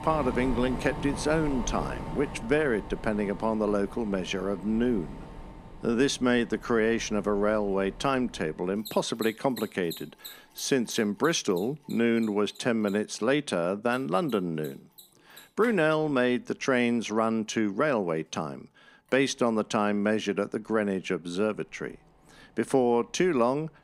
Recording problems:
machinery noise; noticeable; throughout; 15 dB below the speech

